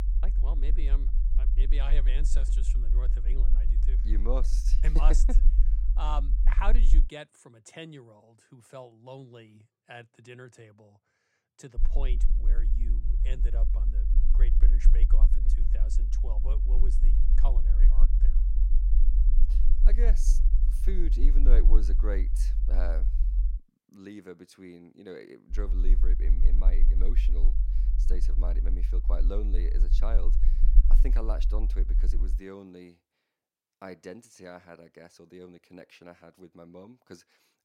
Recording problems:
low rumble; loud; until 7 s, from 12 to 24 s and from 26 to 32 s; 9 dB below the speech

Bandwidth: 16 kHz